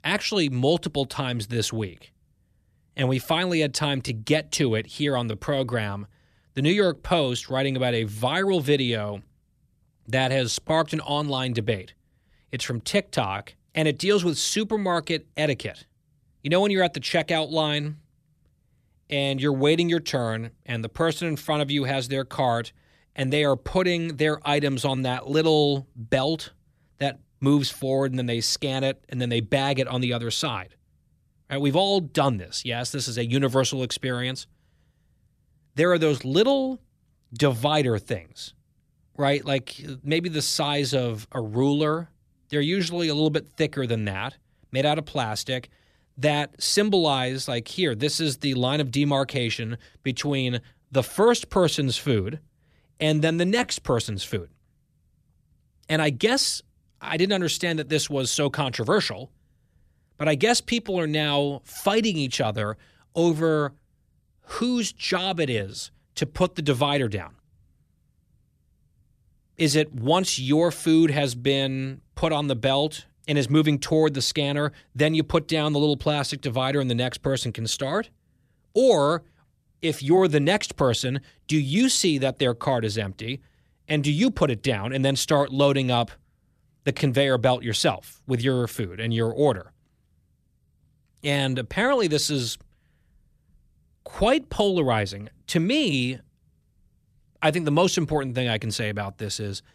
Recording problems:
none

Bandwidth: 14.5 kHz